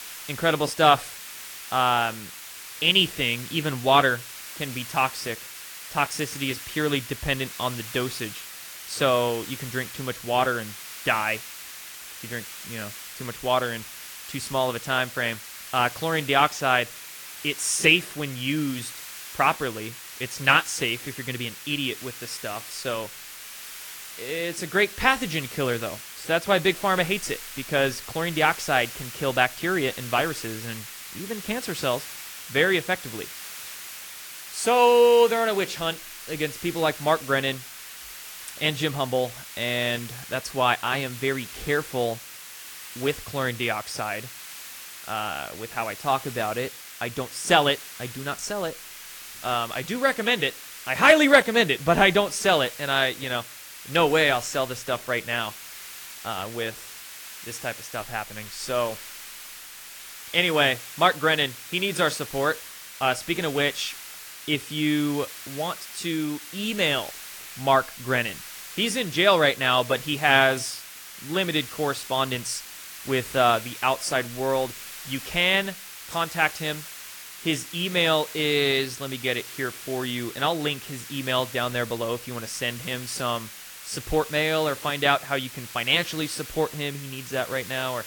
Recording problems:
garbled, watery; slightly
hiss; noticeable; throughout; 15 dB below the speech

